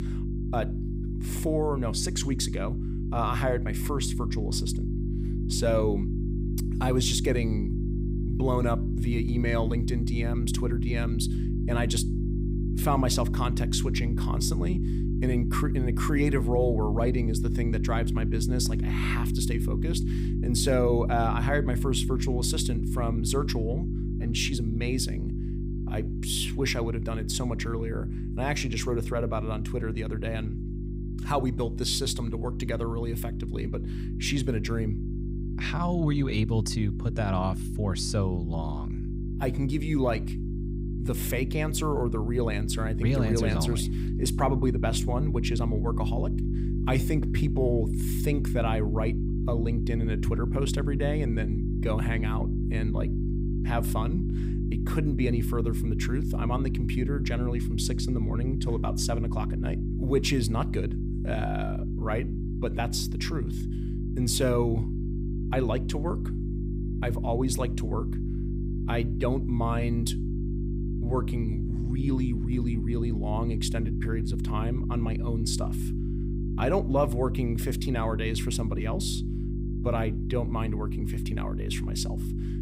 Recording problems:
electrical hum; loud; throughout; 50 Hz, 7 dB below the speech

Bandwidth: 15.5 kHz